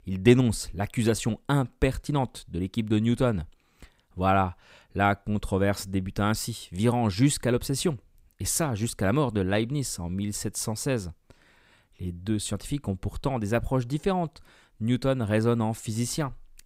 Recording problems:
none

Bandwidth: 15.5 kHz